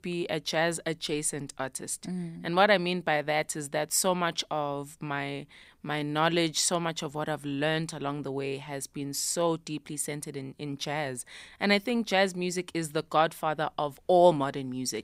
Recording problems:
none

